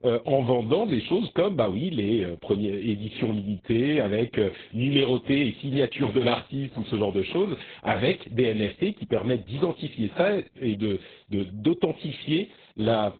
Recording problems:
garbled, watery; badly; nothing above 3.5 kHz

